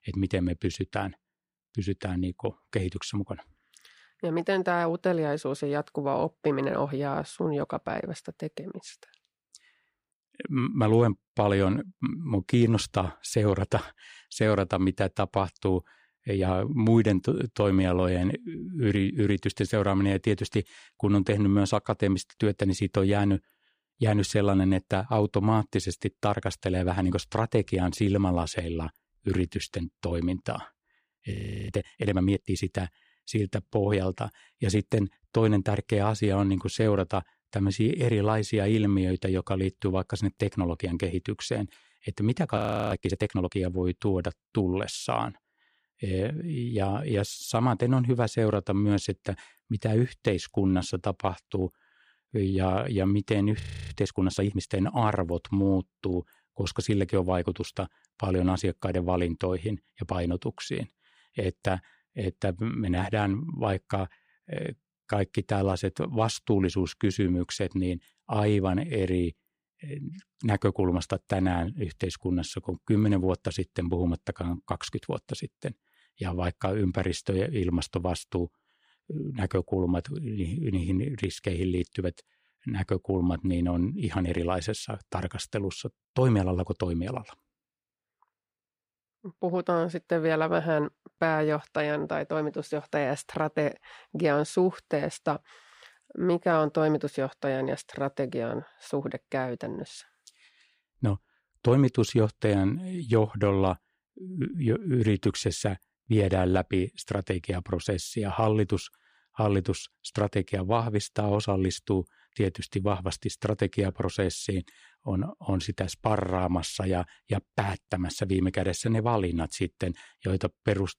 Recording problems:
audio freezing; at 31 s, at 43 s and at 54 s

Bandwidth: 15 kHz